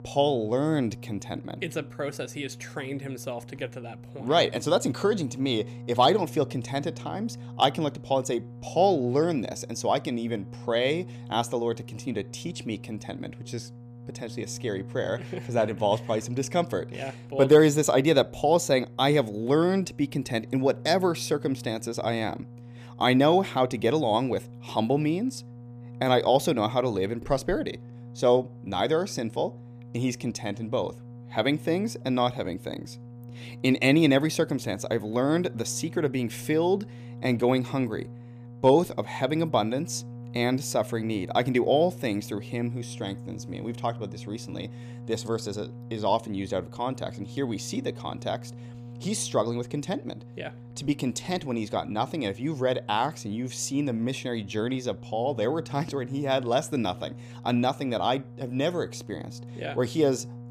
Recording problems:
electrical hum; faint; throughout; 60 Hz, 25 dB below the speech

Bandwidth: 15 kHz